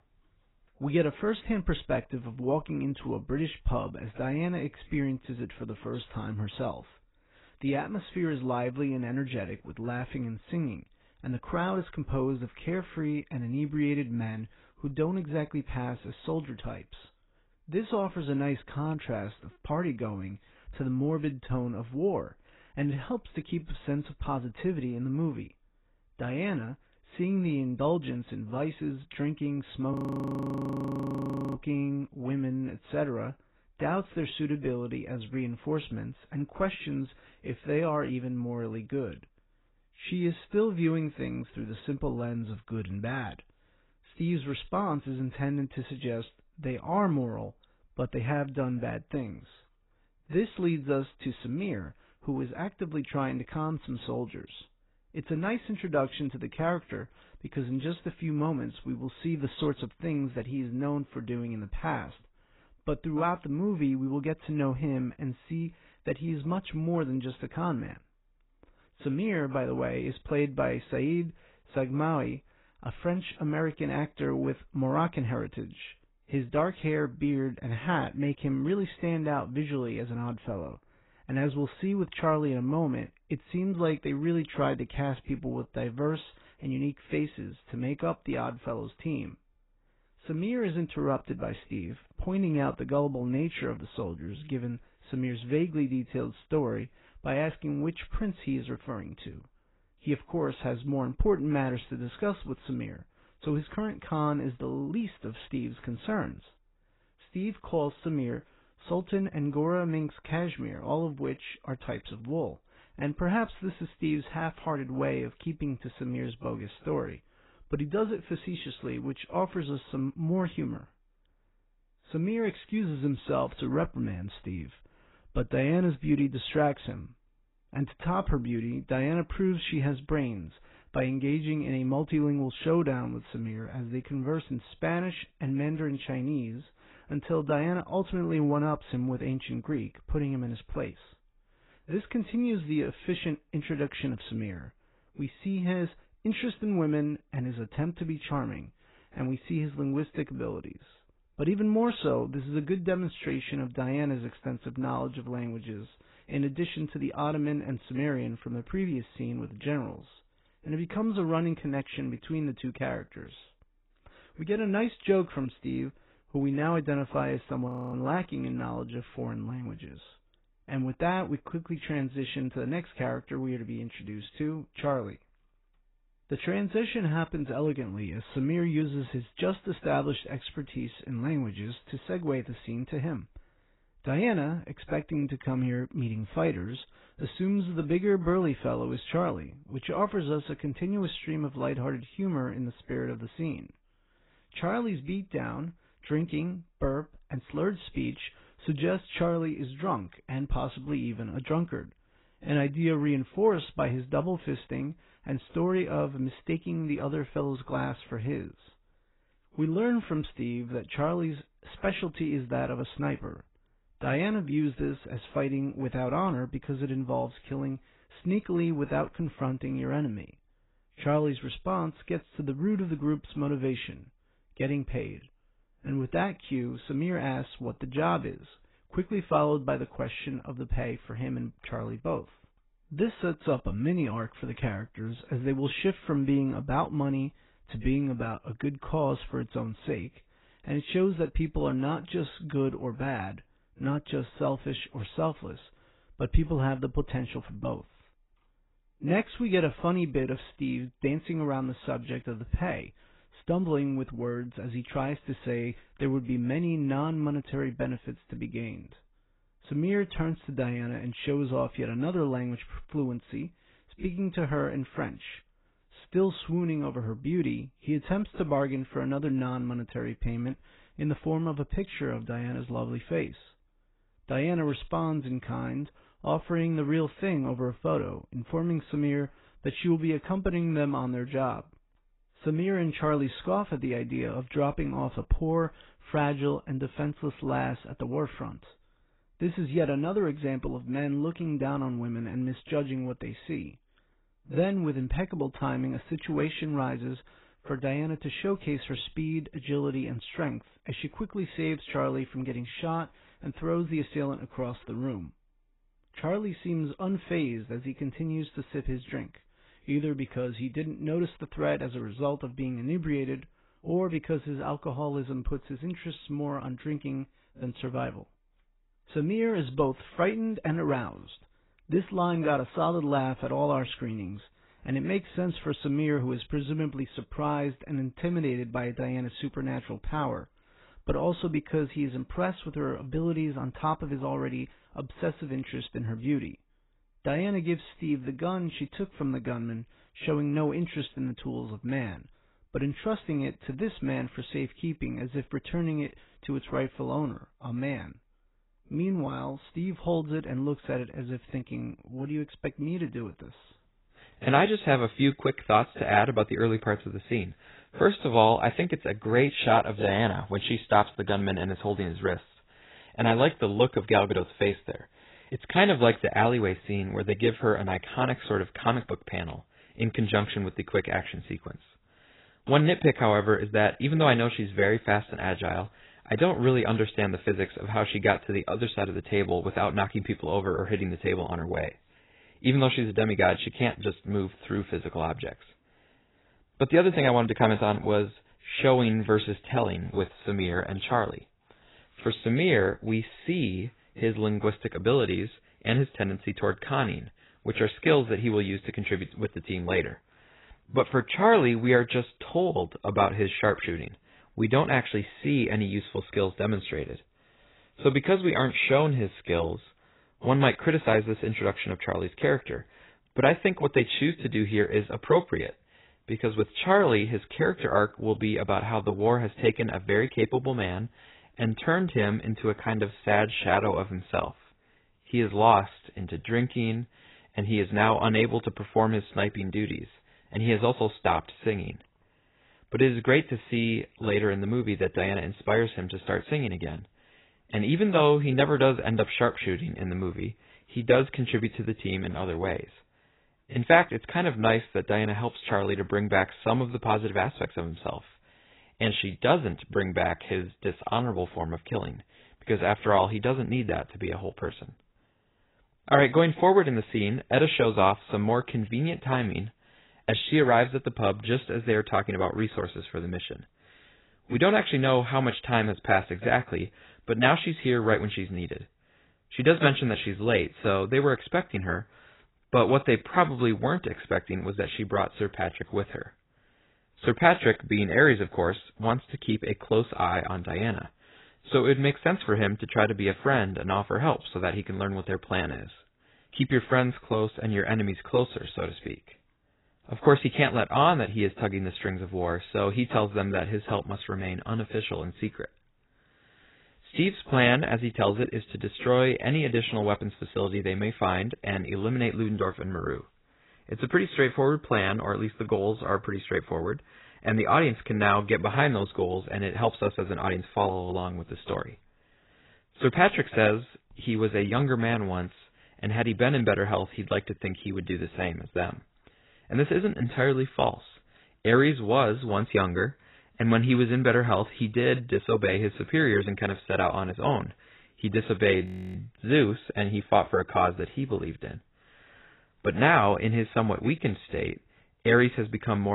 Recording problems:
garbled, watery; badly; nothing above 4 kHz
audio freezing; at 30 s for 1.5 s, at 2:48 and at 8:49
abrupt cut into speech; at the end

